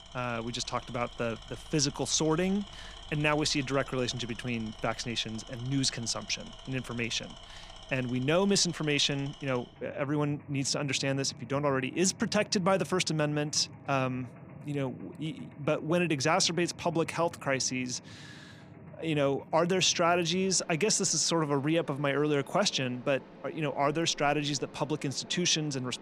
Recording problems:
machinery noise; noticeable; throughout; 20 dB below the speech

